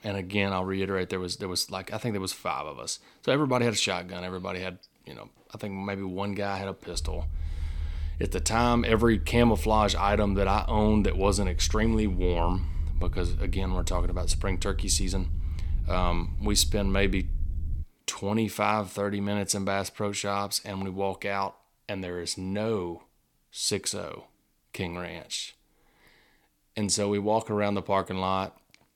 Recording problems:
low rumble; faint; from 7 to 18 s; 25 dB below the speech

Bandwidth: 17.5 kHz